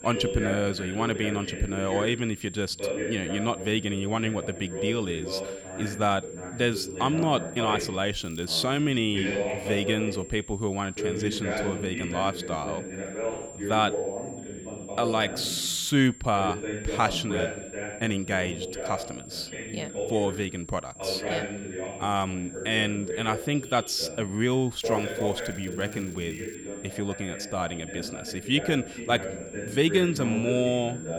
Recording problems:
voice in the background; loud; throughout; 6 dB below the speech
high-pitched whine; noticeable; throughout; 7.5 kHz, 15 dB below the speech
crackling; faint; at 8 s and from 25 to 27 s; 25 dB below the speech

